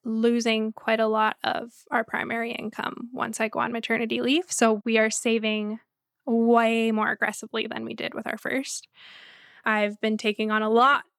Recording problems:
none

